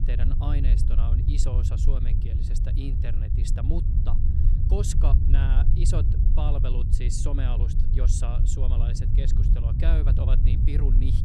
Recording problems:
low rumble; loud; throughout; 2 dB below the speech

